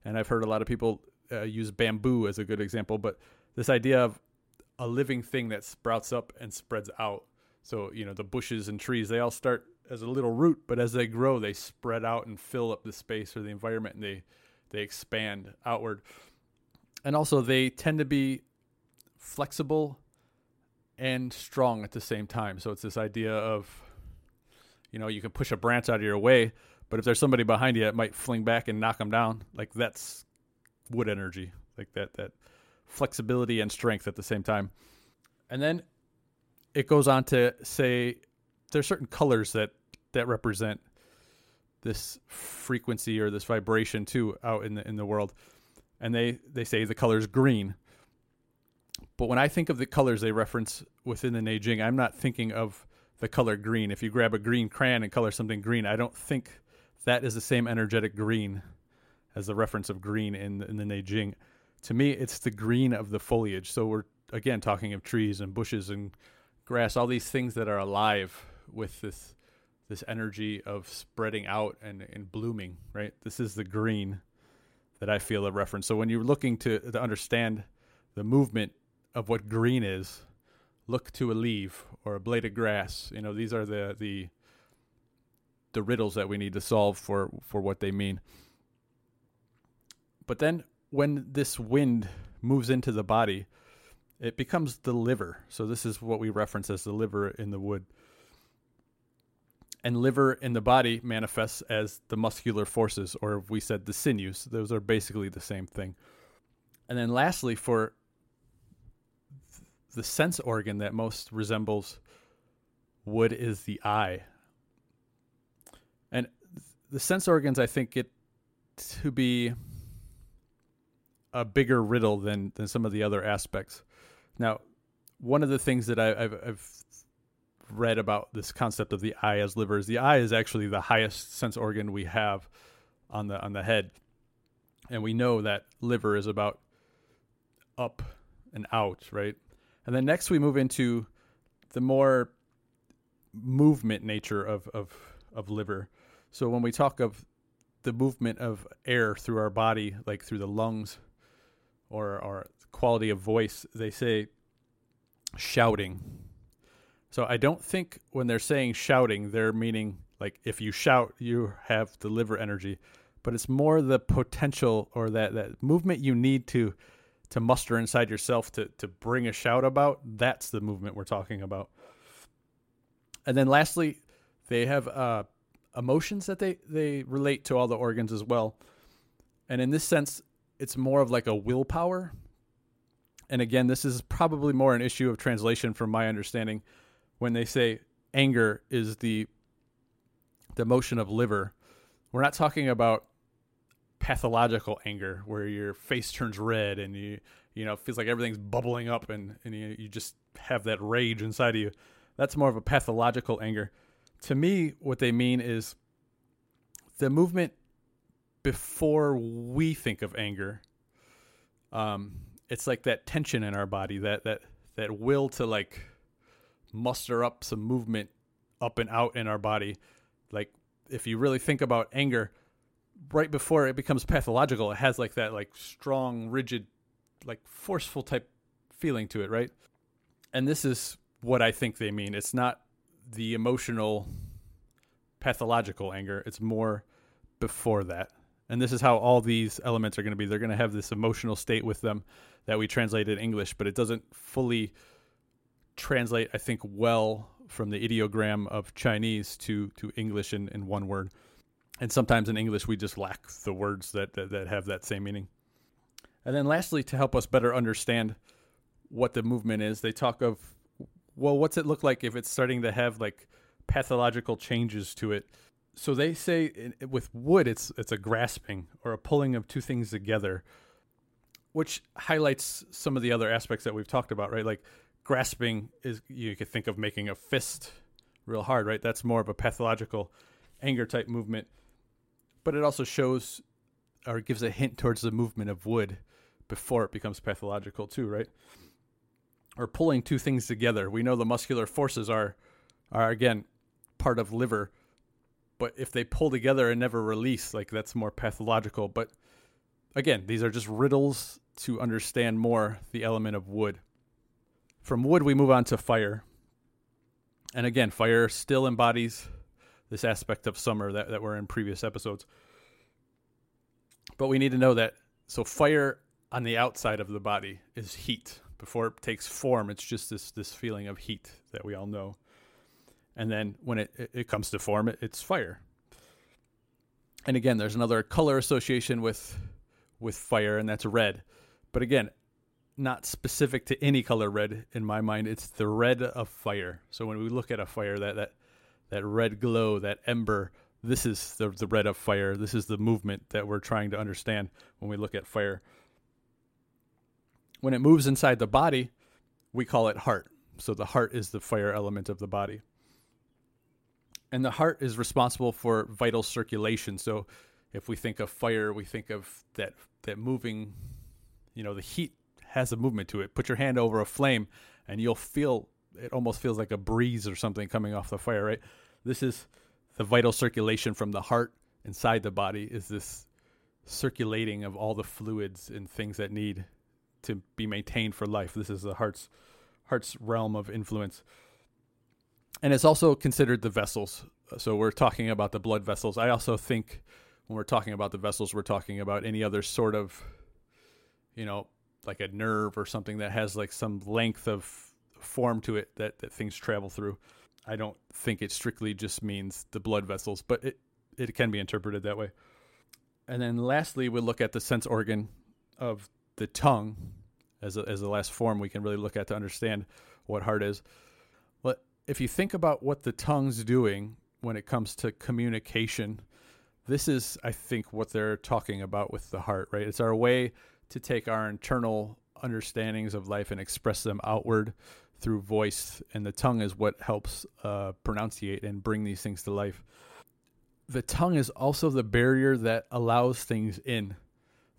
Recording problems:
none

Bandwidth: 16 kHz